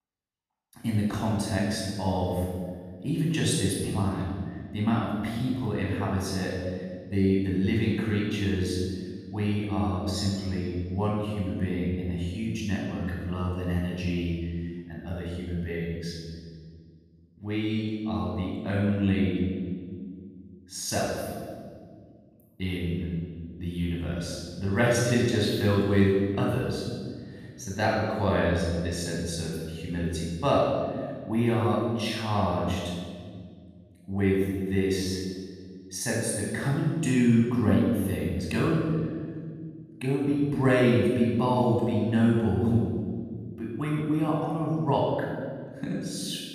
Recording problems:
room echo; strong; dies away in 1.8 s
off-mic speech; far

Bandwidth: 14.5 kHz